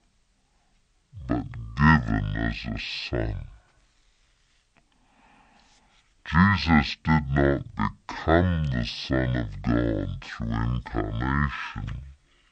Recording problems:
wrong speed and pitch; too slow and too low; 0.5 times normal speed

